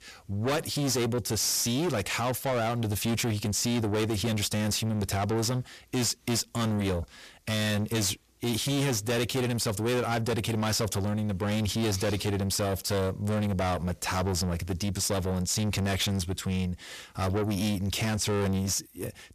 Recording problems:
distortion; heavy; 6 dB below the speech

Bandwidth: 14.5 kHz